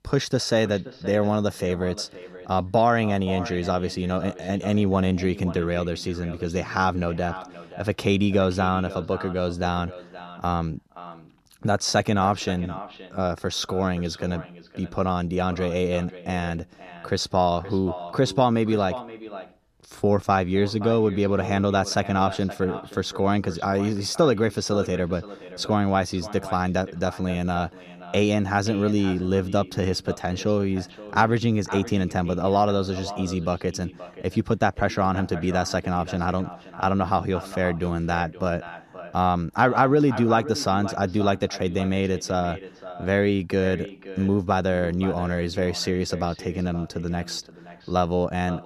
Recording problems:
echo of what is said; noticeable; throughout; 520 ms later, 15 dB below the speech

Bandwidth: 14 kHz